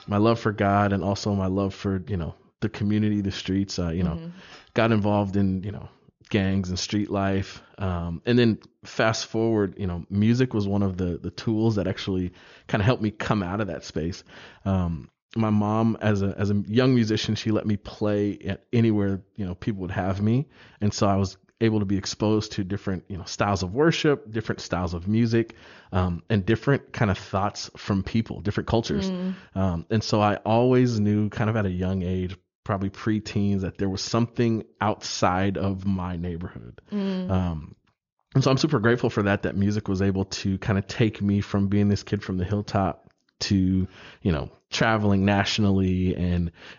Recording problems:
high frequencies cut off; noticeable; nothing above 7 kHz

